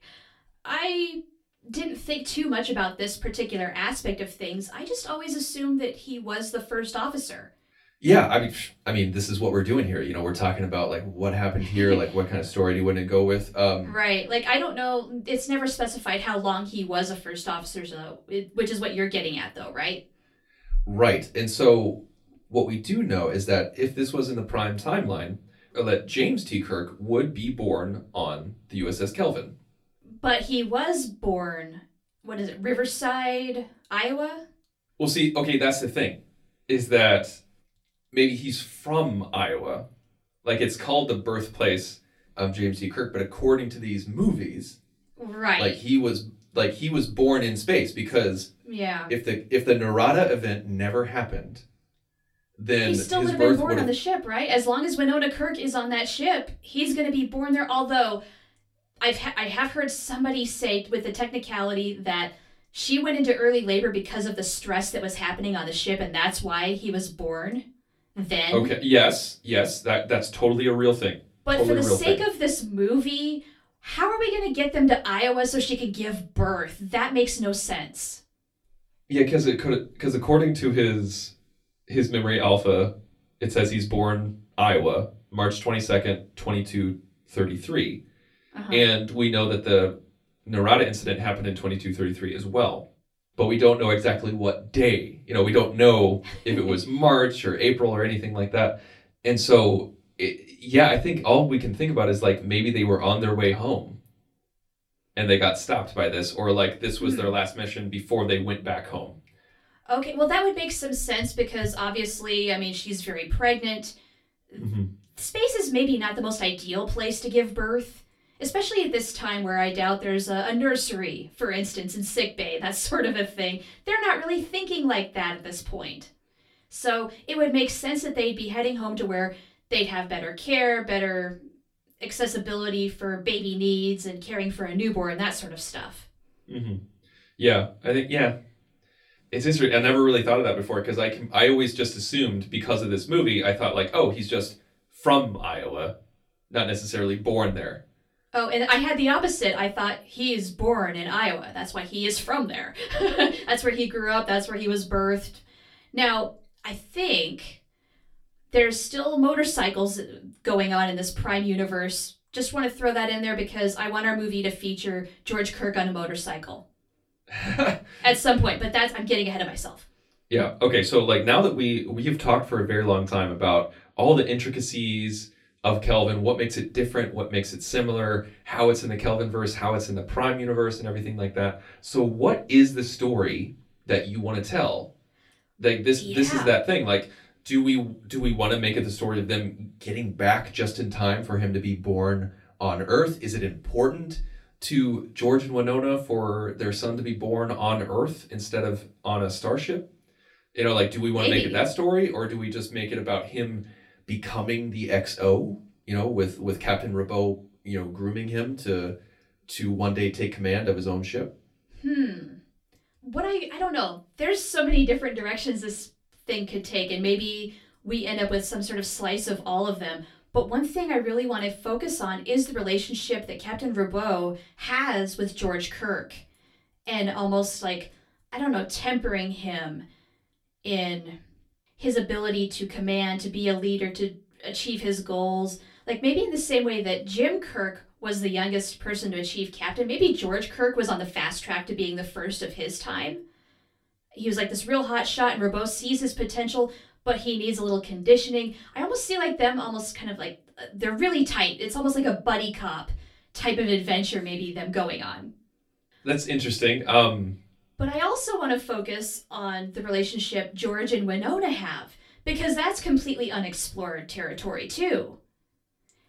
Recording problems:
off-mic speech; far
room echo; very slight; dies away in 0.2 s

